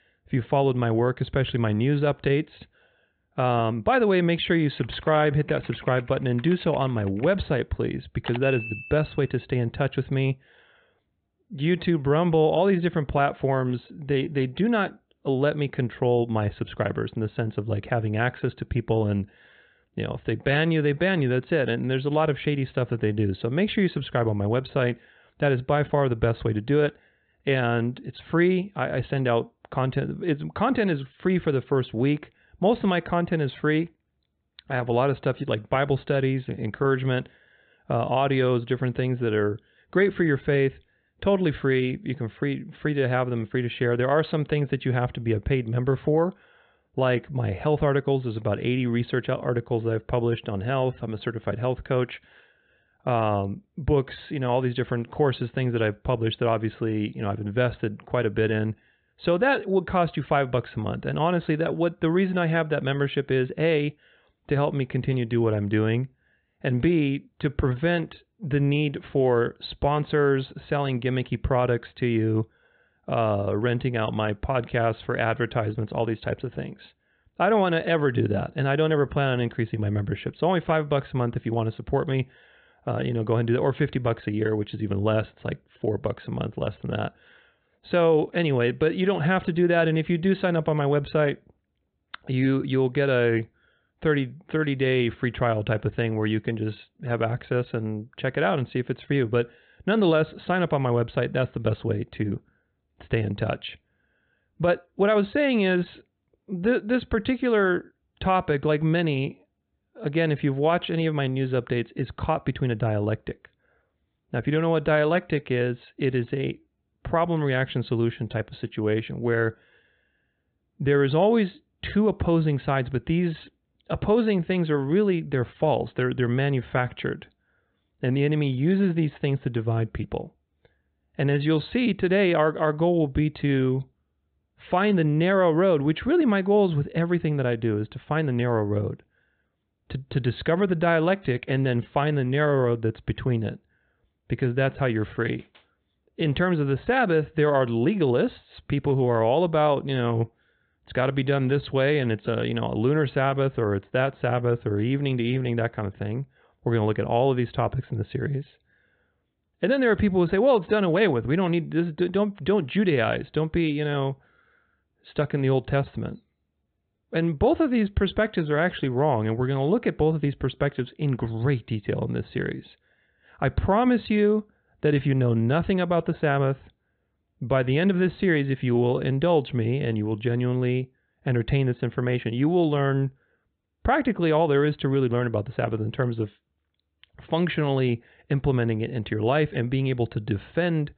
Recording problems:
high frequencies cut off; severe; nothing above 4 kHz

